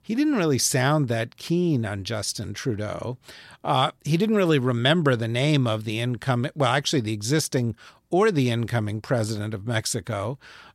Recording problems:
none

